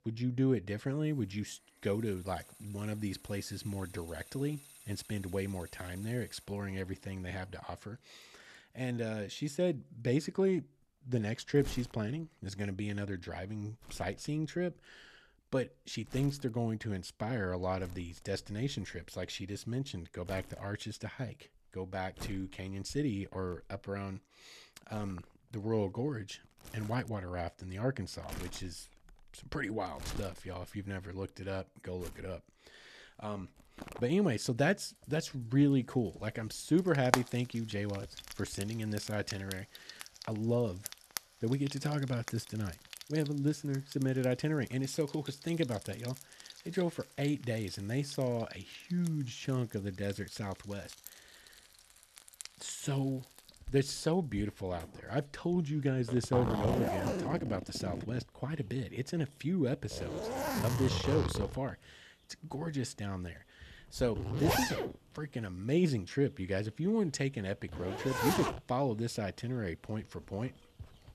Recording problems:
household noises; loud; throughout; 6 dB below the speech

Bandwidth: 13.5 kHz